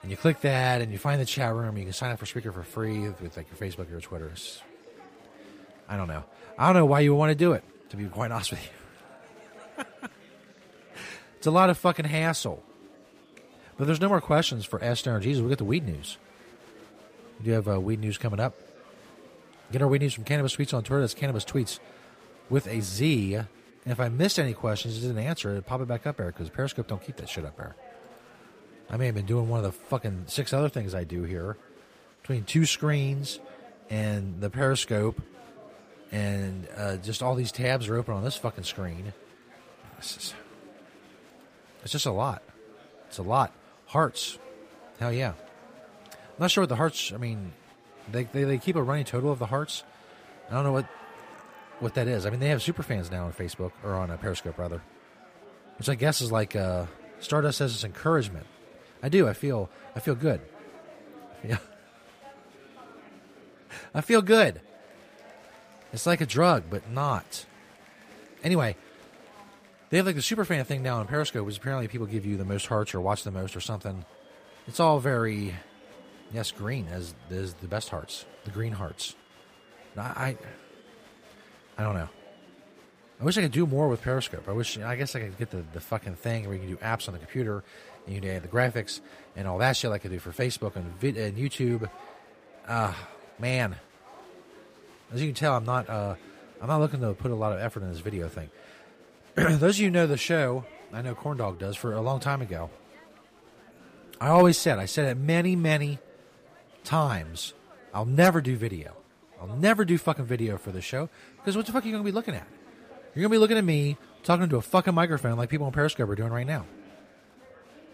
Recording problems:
chatter from many people; faint; throughout; 25 dB below the speech

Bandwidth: 15 kHz